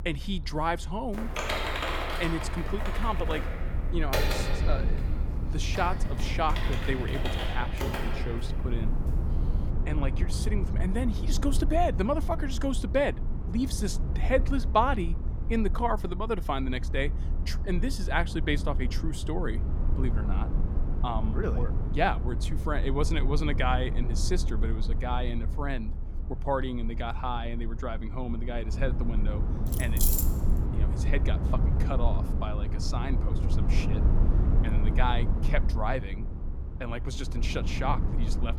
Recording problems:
low rumble; noticeable; throughout; 10 dB below the speech
keyboard typing; loud; from 1 to 8.5 s; peak 3 dB above the speech
jangling keys; loud; at 30 s; peak 5 dB above the speech

